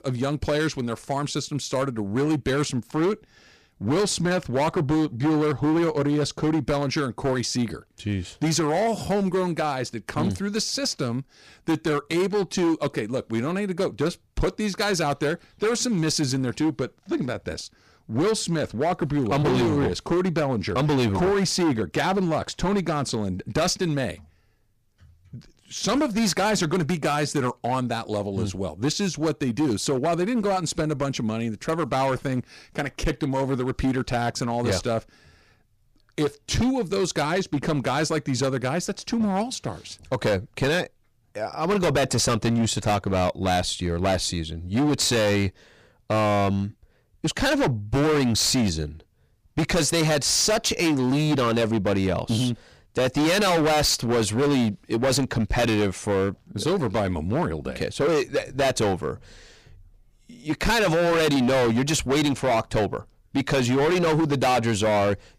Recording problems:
distortion; heavy; 15% of the sound clipped

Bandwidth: 15 kHz